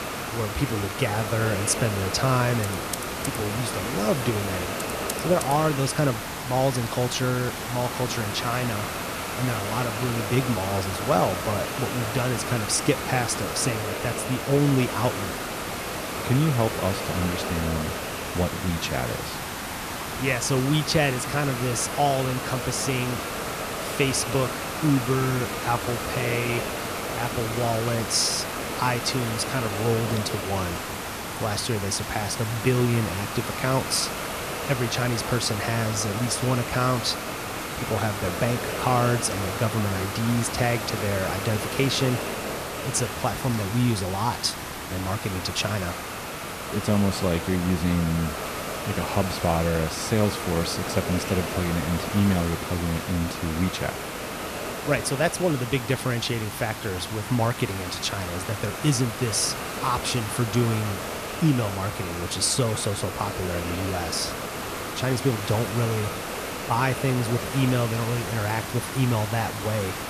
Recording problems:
hiss; loud; throughout; 4 dB below the speech
keyboard typing; noticeable; from 2.5 to 5.5 s; peak 7 dB below the speech

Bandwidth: 14.5 kHz